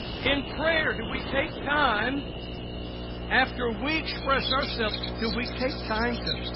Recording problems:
distortion; heavy; 7 dB below the speech
garbled, watery; badly; nothing above 5.5 kHz
animal sounds; loud; throughout; 8 dB below the speech
electrical hum; noticeable; throughout; 60 Hz, 15 dB below the speech
train or aircraft noise; noticeable; throughout; 20 dB below the speech

